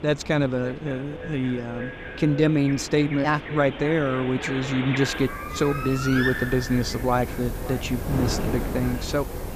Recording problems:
echo of what is said; noticeable; throughout; 560 ms later, 15 dB below the speech
animal sounds; loud; throughout; 8 dB below the speech
wind noise on the microphone; occasional gusts; 15 dB below the speech

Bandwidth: 14.5 kHz